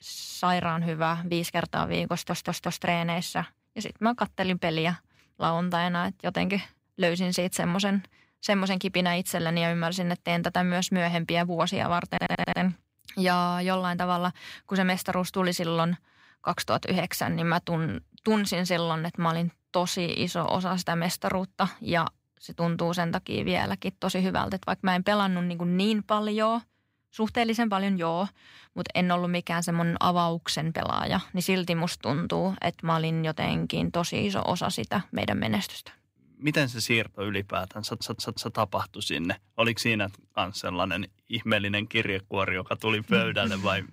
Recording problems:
audio stuttering; at 2 s, at 12 s and at 38 s

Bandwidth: 15.5 kHz